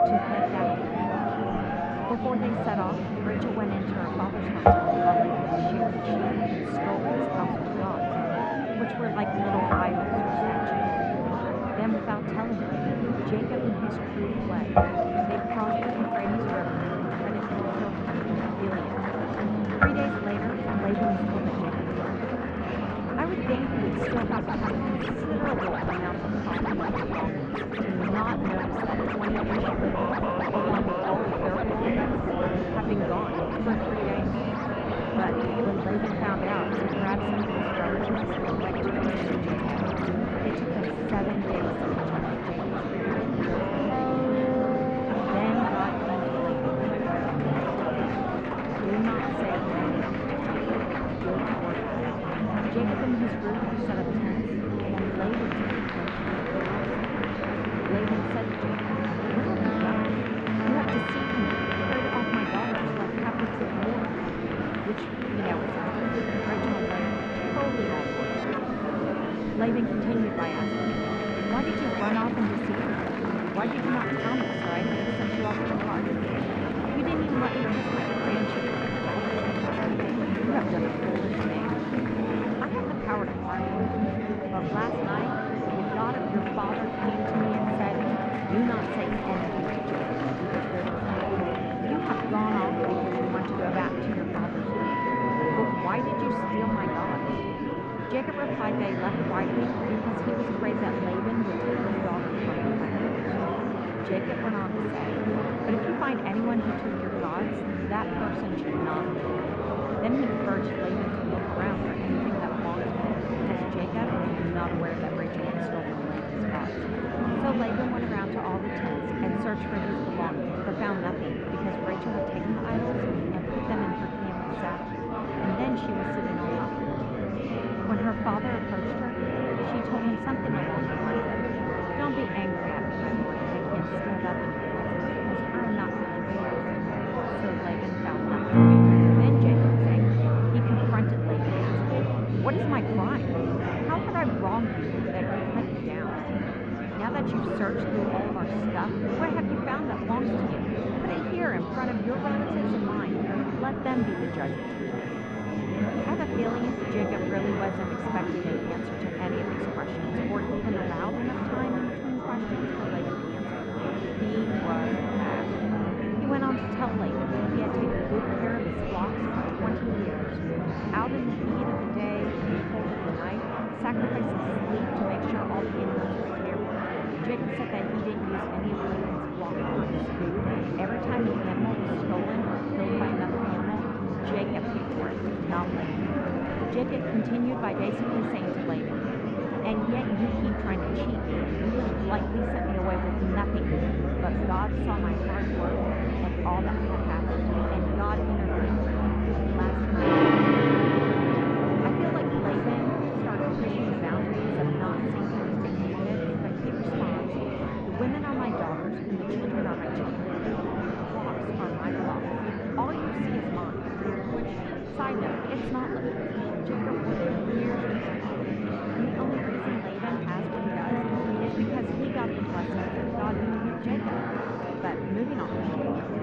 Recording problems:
muffled; very; fading above 2 kHz
background music; very loud; throughout; 2 dB above the speech
murmuring crowd; very loud; throughout; 4 dB above the speech

